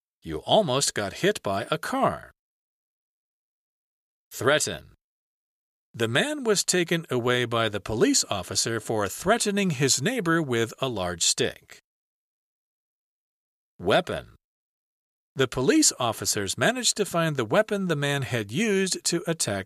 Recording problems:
none

